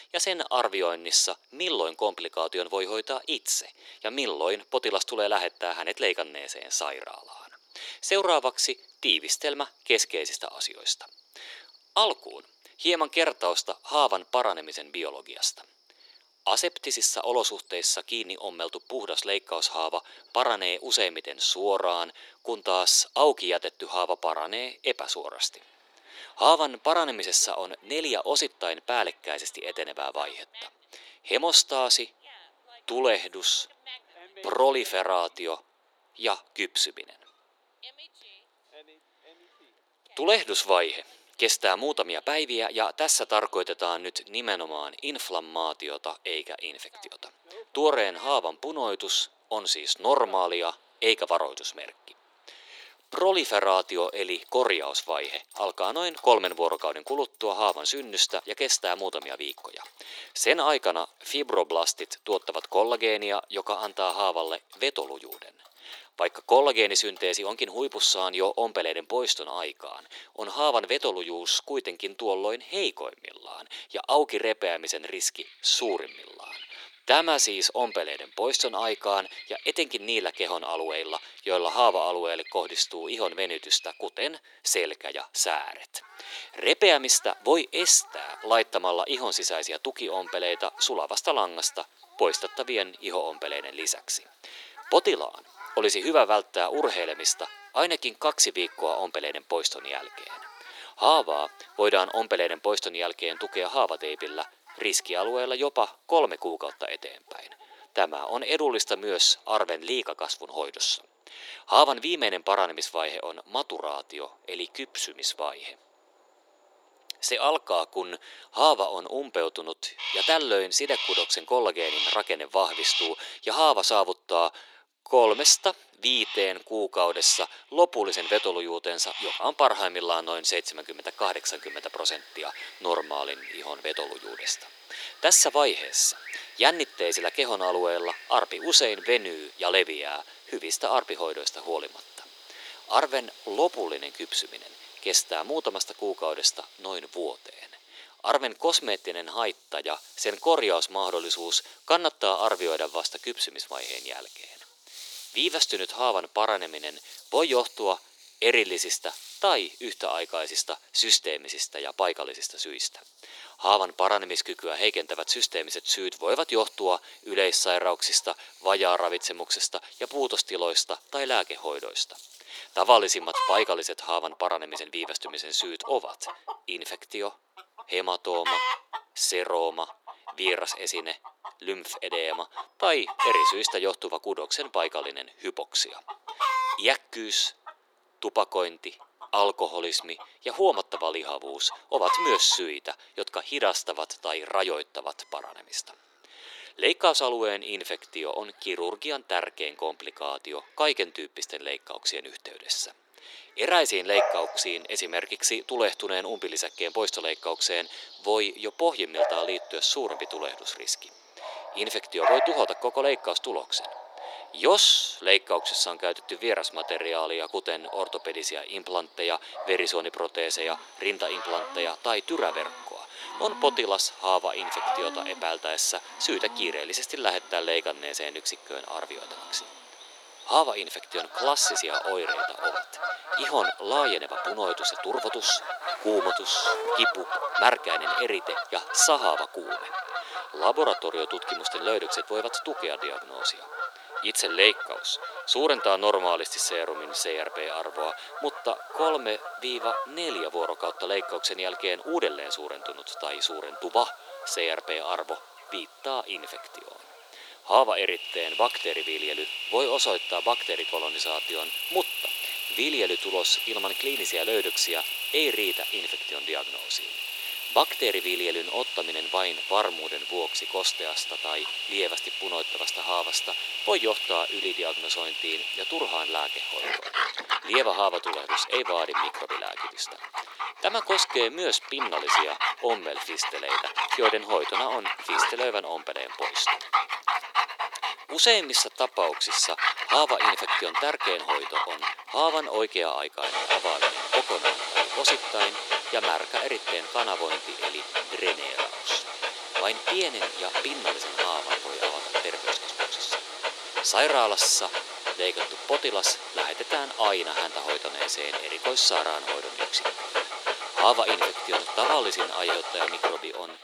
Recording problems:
thin; very; fading below 350 Hz
animal sounds; loud; throughout; 5 dB below the speech

